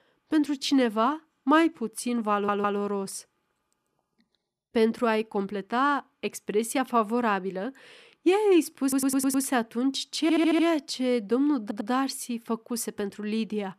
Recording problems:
audio stuttering; 4 times, first at 2.5 s

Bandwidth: 14.5 kHz